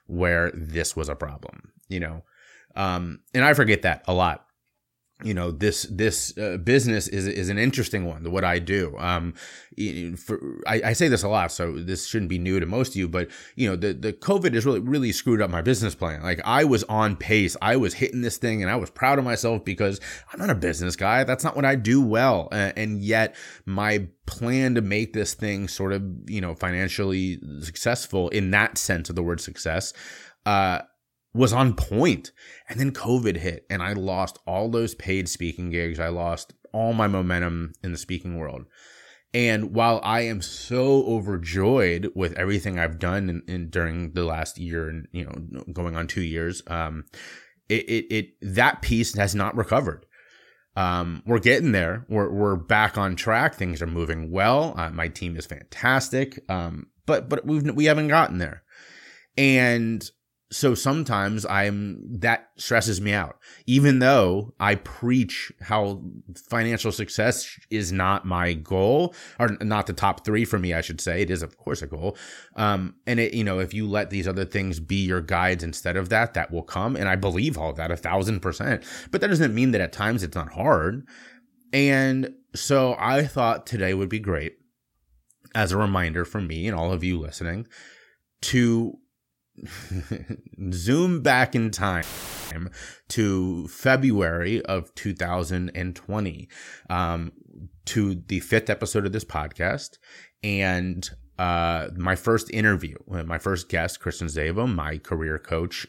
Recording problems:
audio cutting out; filled with static; at 1:32

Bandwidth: 16.5 kHz